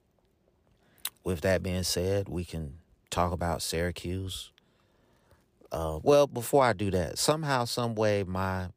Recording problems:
none

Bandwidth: 15 kHz